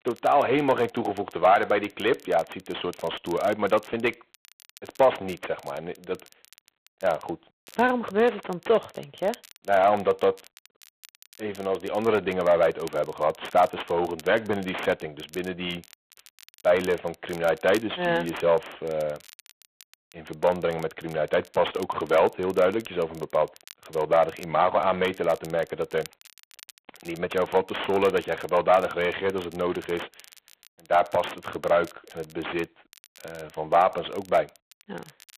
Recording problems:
phone-call audio; poor line; nothing above 3.5 kHz
distortion; slight; 9 dB below the speech
crackle, like an old record; faint; 25 dB below the speech

